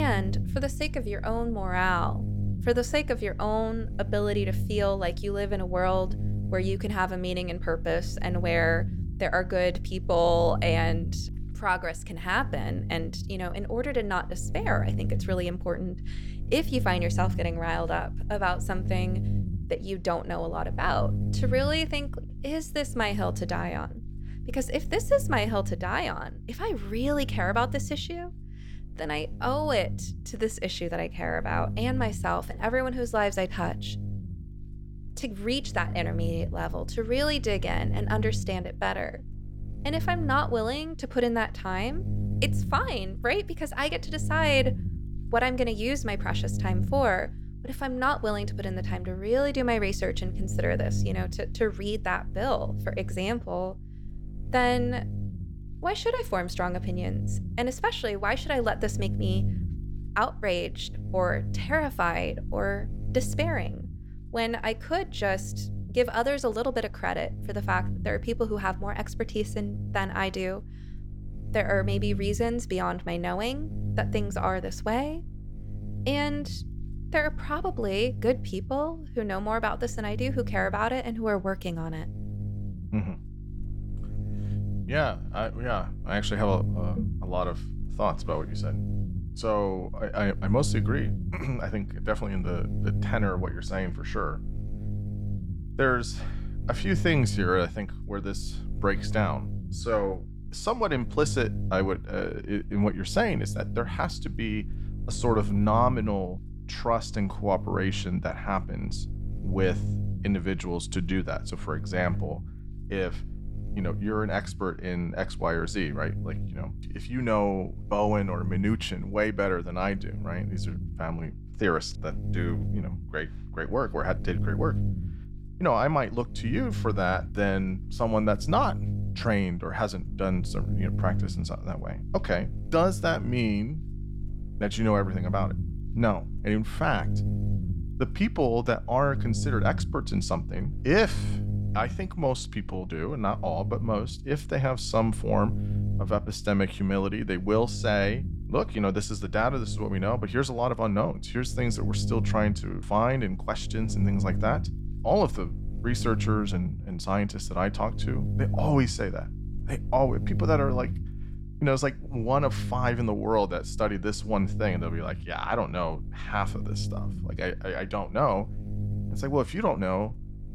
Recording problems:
electrical hum; noticeable; throughout; 50 Hz, 15 dB below the speech
abrupt cut into speech; at the start

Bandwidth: 17 kHz